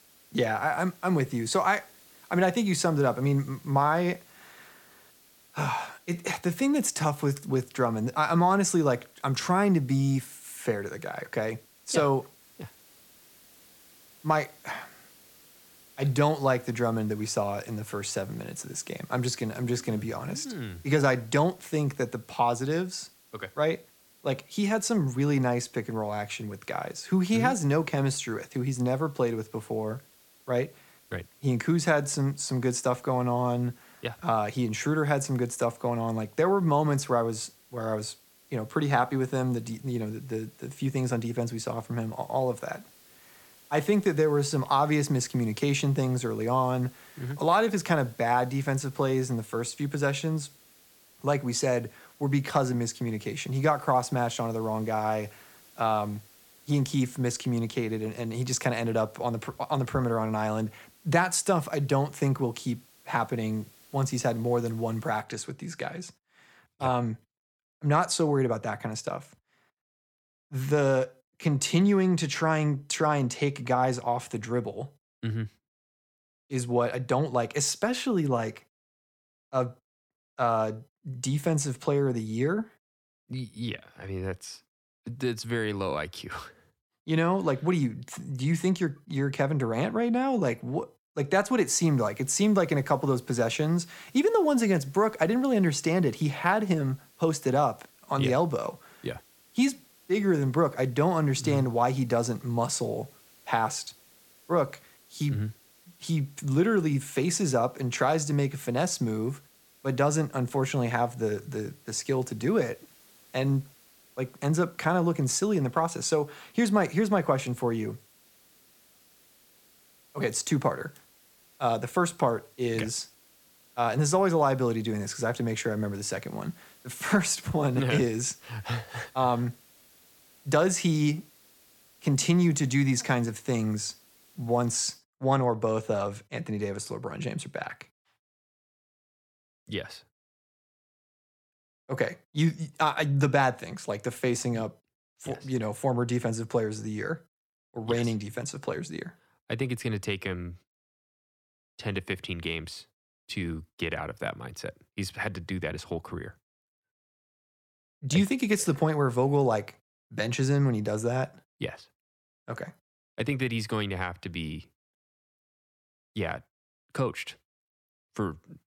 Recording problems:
hiss; faint; until 1:05 and from 1:32 to 2:15; 25 dB below the speech

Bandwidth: 17 kHz